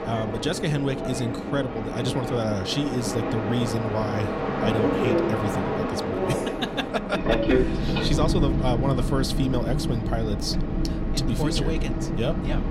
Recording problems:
train or aircraft noise; very loud; throughout; 2 dB above the speech

